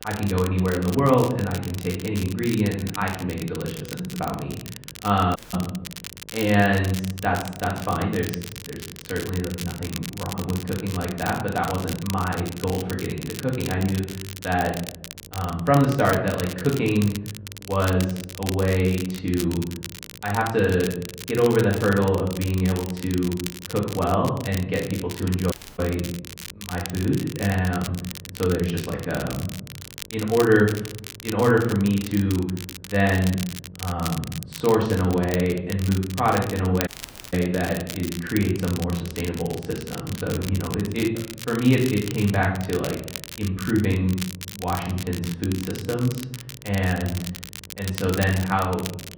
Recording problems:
off-mic speech; far
room echo; noticeable; dies away in 0.7 s
muffled; slightly; fading above 3.5 kHz
crackle, like an old record; noticeable; 10 dB below the speech
electrical hum; faint; throughout; 50 Hz, 30 dB below the speech
audio cutting out; at 5.5 s, at 26 s and at 37 s

